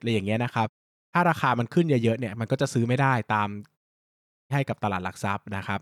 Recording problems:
audio cutting out; at 0.5 s and at 4 s for 0.5 s

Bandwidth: 18.5 kHz